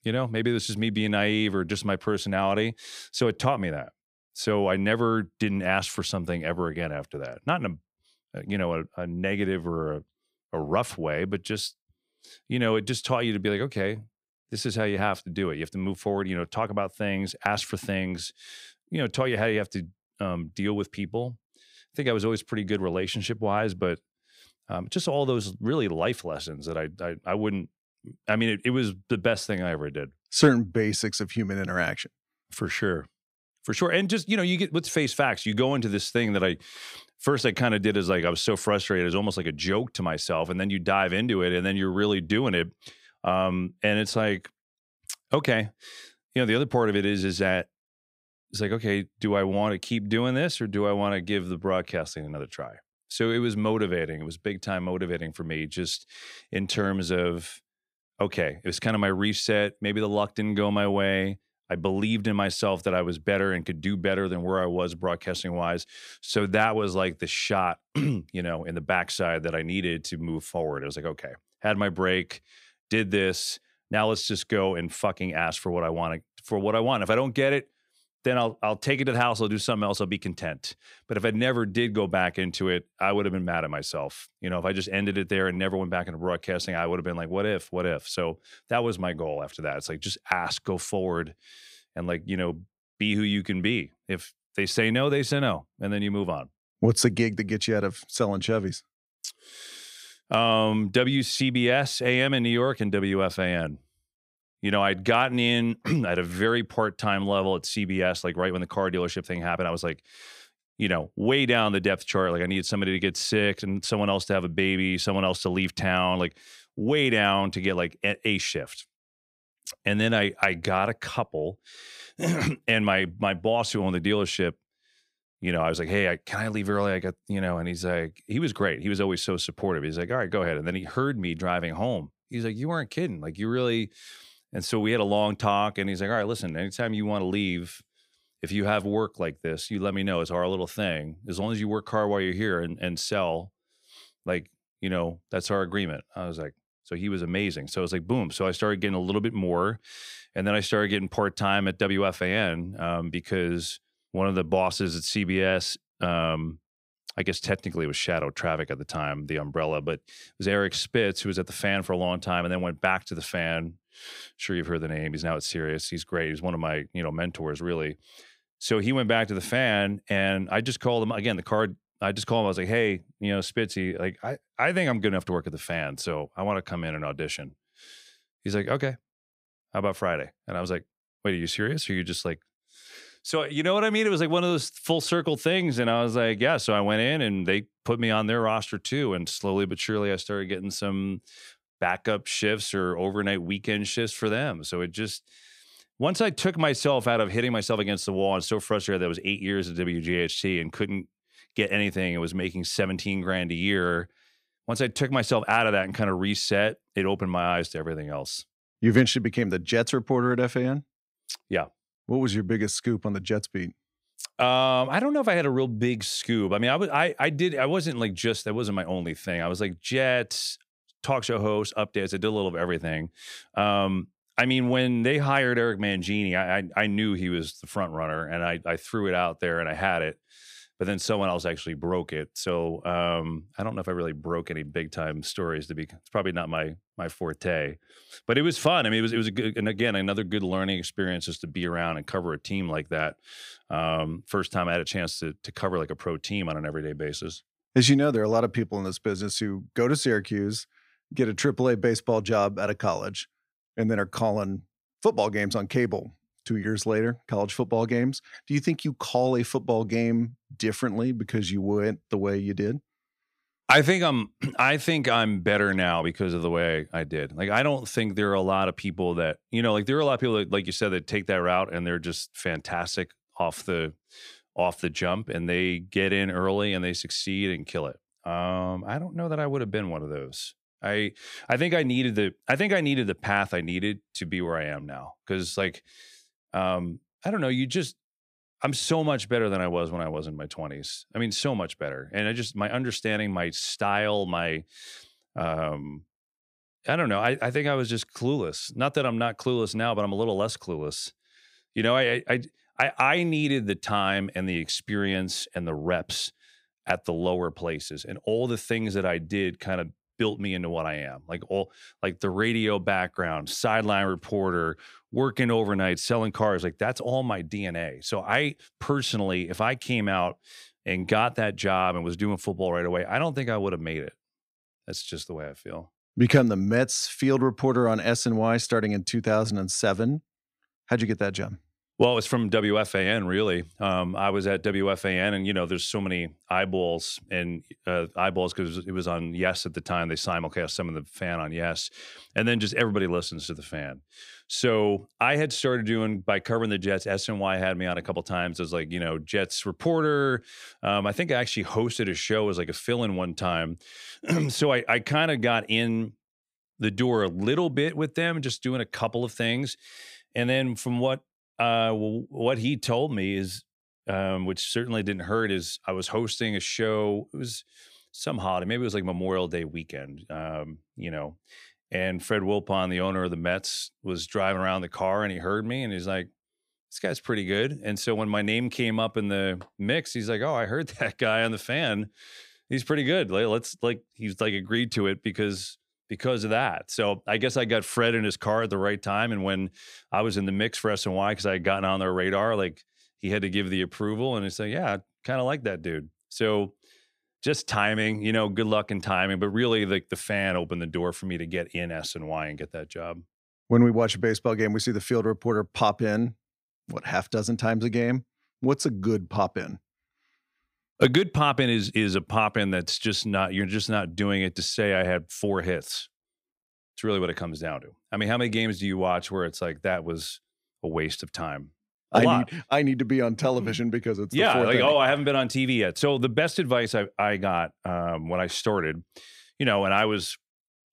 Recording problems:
none

